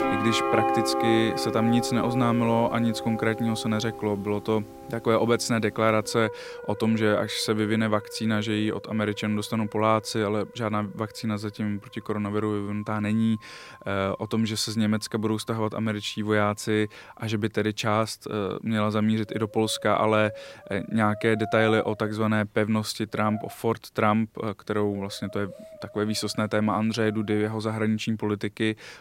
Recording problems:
background music; loud; throughout; 8 dB below the speech

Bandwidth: 16 kHz